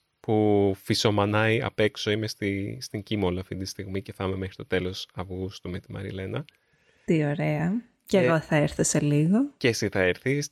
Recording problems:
none

